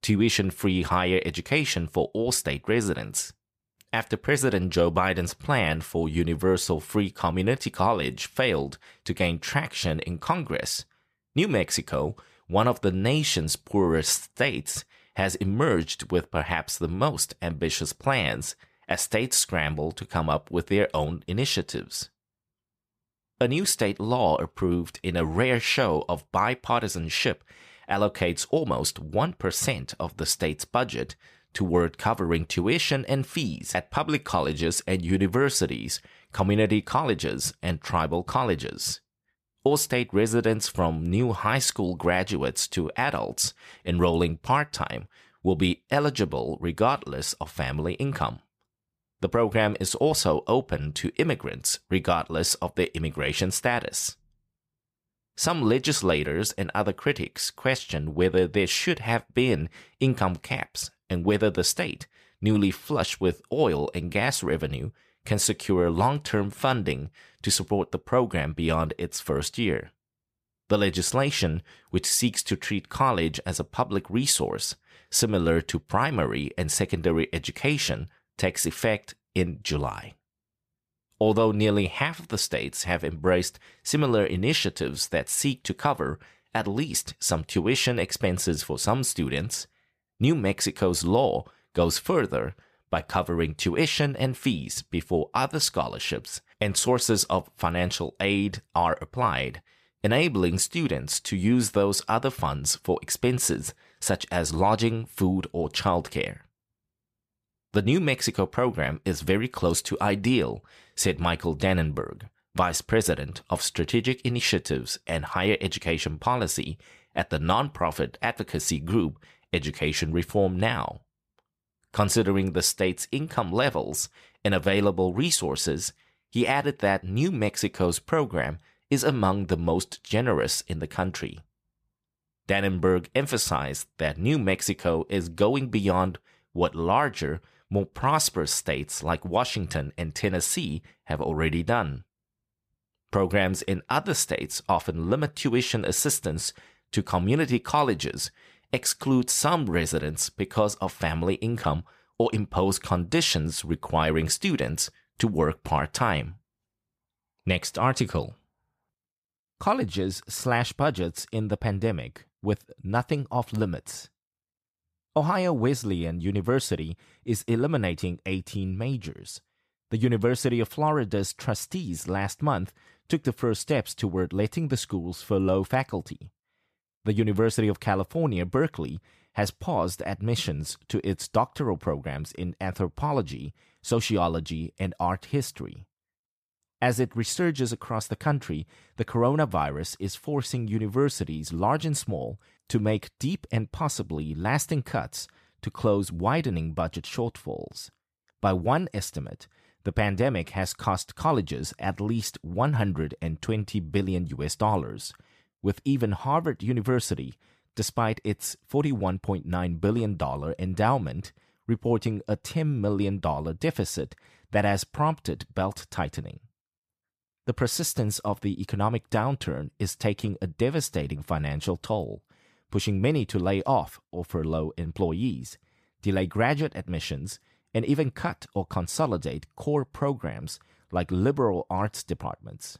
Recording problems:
none

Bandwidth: 14.5 kHz